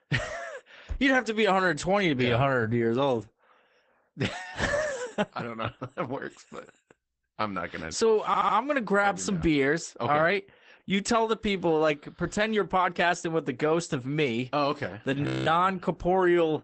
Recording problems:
garbled, watery; badly; nothing above 8 kHz
audio stuttering; at 8.5 s
audio freezing; at 15 s

